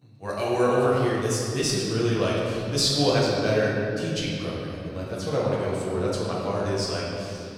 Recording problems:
room echo; strong; dies away in 2.5 s
off-mic speech; far

